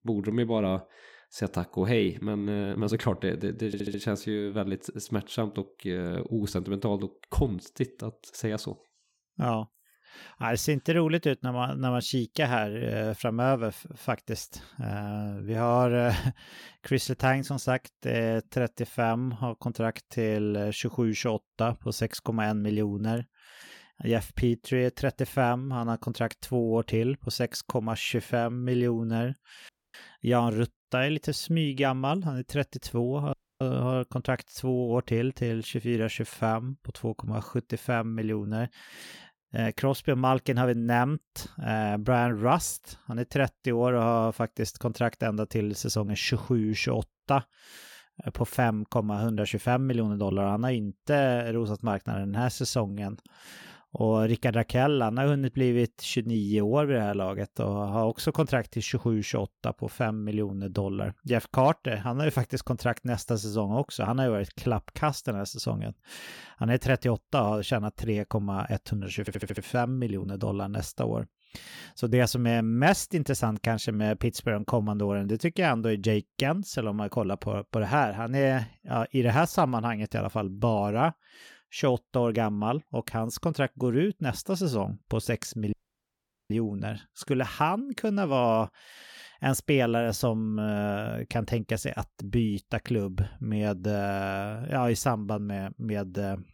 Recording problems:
audio stuttering; at 3.5 s and at 1:09
audio cutting out; at 30 s, at 33 s and at 1:26 for 1 s

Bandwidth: 18 kHz